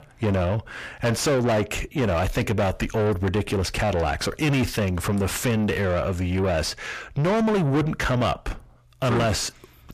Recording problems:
distortion; heavy; 5 dB below the speech

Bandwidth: 14.5 kHz